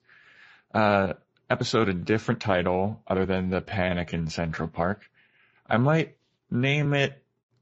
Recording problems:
garbled, watery; slightly; nothing above 7.5 kHz
uneven, jittery; strongly; from 0.5 to 7 s

